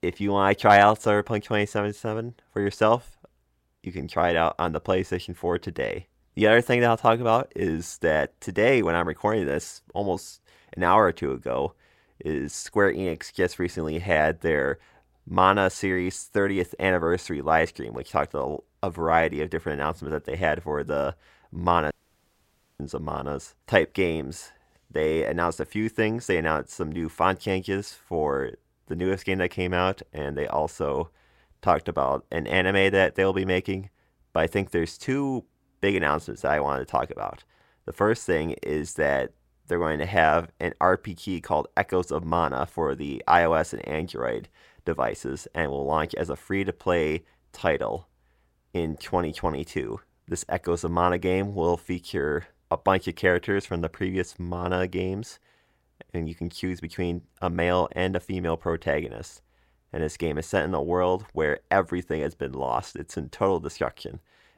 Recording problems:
audio cutting out; at 22 s for 1 s

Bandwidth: 16 kHz